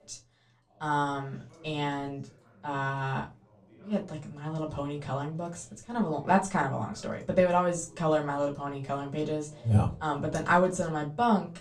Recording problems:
off-mic speech; far
room echo; very slight; dies away in 0.2 s
voice in the background; faint; throughout; 25 dB below the speech

